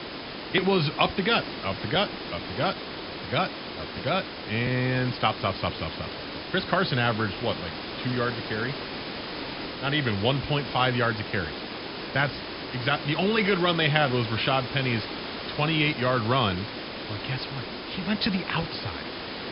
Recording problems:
high frequencies cut off; noticeable; nothing above 5.5 kHz
hiss; loud; throughout; 8 dB below the speech

